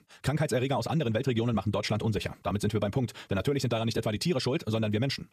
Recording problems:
wrong speed, natural pitch; too fast; 1.7 times normal speed

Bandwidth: 14.5 kHz